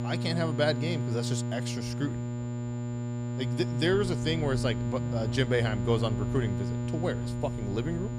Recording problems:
electrical hum; loud; throughout; 60 Hz, 7 dB below the speech
high-pitched whine; faint; throughout; 7 kHz, 25 dB below the speech
voice in the background; faint; throughout; 30 dB below the speech
low rumble; faint; throughout; 25 dB below the speech

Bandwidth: 15 kHz